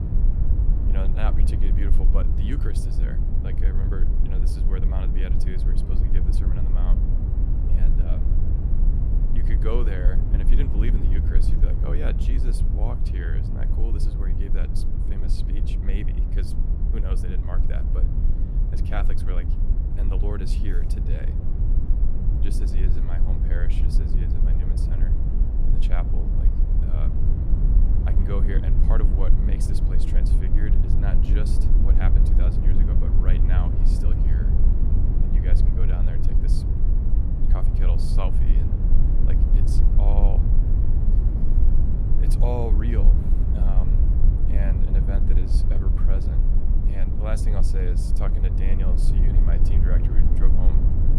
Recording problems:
low rumble; loud; throughout; 1 dB below the speech

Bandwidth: 15.5 kHz